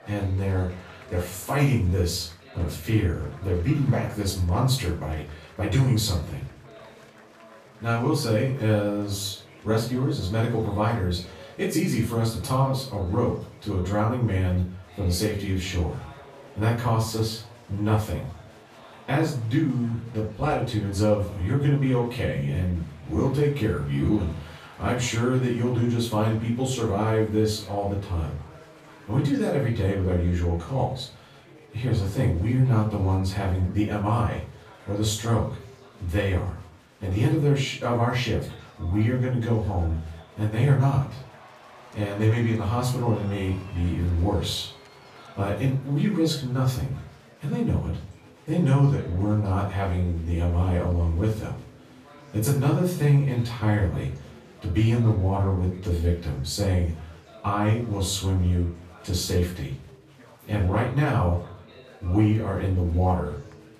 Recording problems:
off-mic speech; far
room echo; noticeable; dies away in 0.4 s
chatter from many people; faint; throughout; 25 dB below the speech

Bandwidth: 14.5 kHz